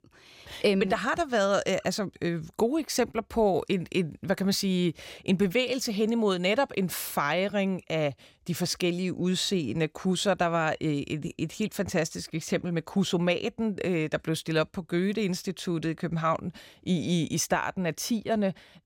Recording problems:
none

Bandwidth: 16.5 kHz